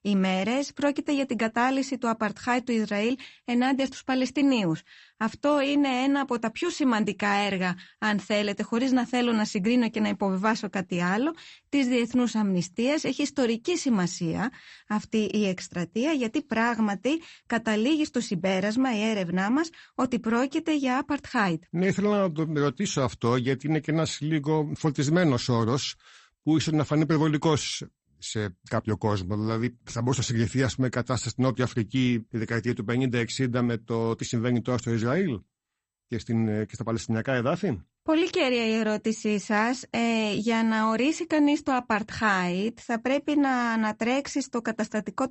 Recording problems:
garbled, watery; slightly; nothing above 8 kHz

